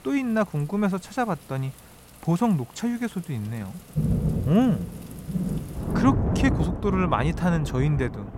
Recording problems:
rain or running water; loud; throughout; 3 dB below the speech

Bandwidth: 16 kHz